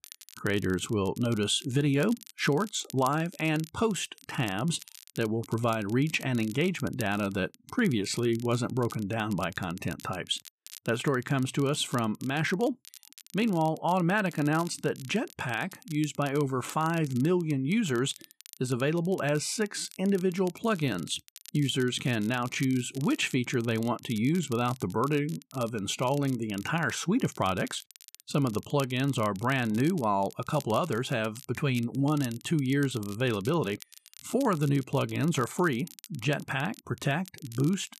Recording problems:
crackle, like an old record; noticeable; 20 dB below the speech

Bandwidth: 13.5 kHz